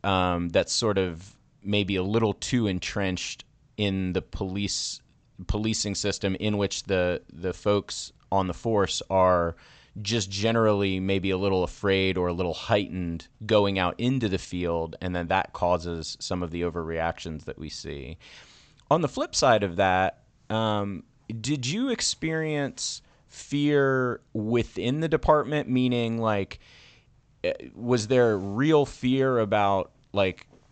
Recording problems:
high frequencies cut off; noticeable; nothing above 8 kHz

